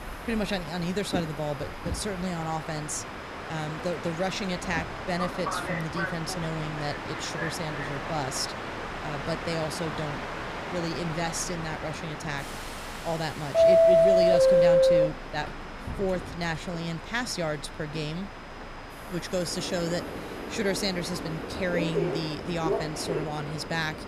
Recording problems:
train or aircraft noise; very loud; throughout; 3 dB above the speech
high-pitched whine; faint; throughout; 5 kHz, 25 dB below the speech
hiss; faint; throughout; 30 dB below the speech

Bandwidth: 15.5 kHz